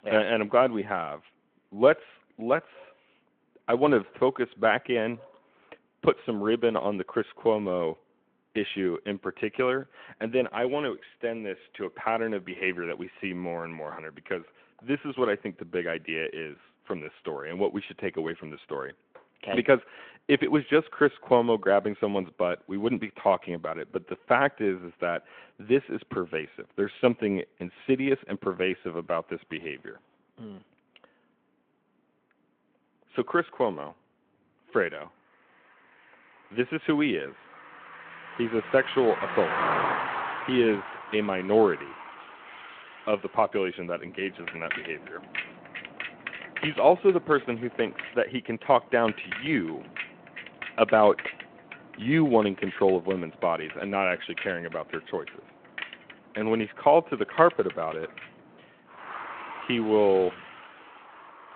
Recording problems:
phone-call audio
traffic noise; loud; from 35 s on; 10 dB below the speech

